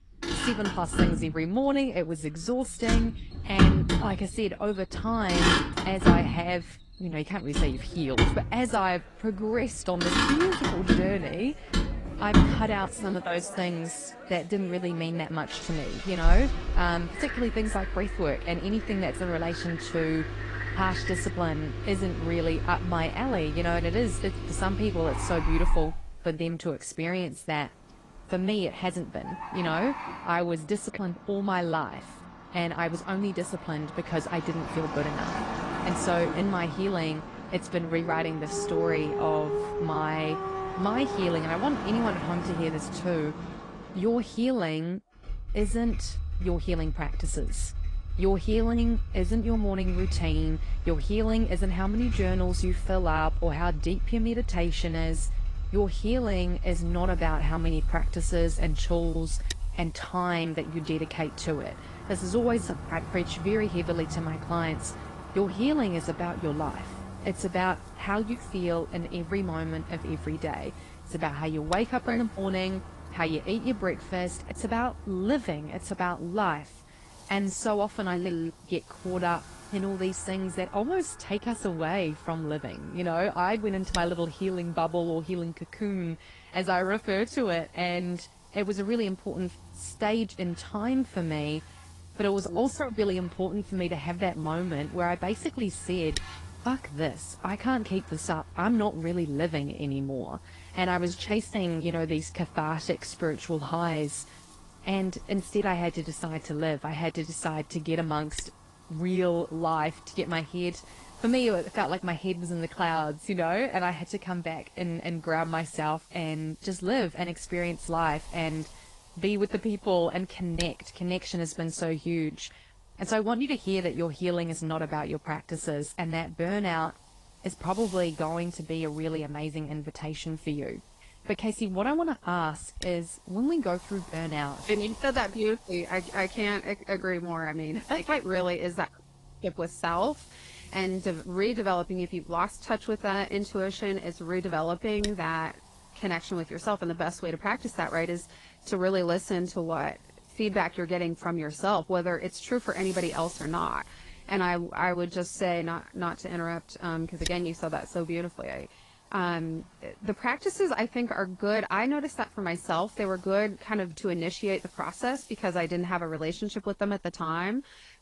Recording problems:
garbled, watery; slightly
animal sounds; loud; until 58 s; 9 dB below the speech
traffic noise; loud; throughout; 3 dB below the speech
wind noise on the microphone; occasional gusts; from 57 s on; 20 dB below the speech

